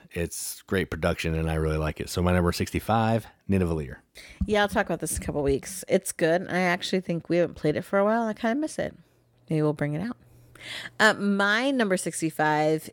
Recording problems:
none

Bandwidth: 17 kHz